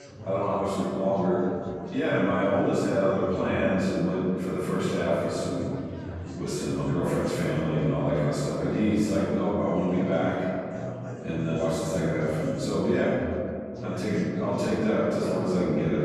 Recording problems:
room echo; strong; dies away in 2.4 s
off-mic speech; far
chatter from many people; noticeable; throughout; 15 dB below the speech

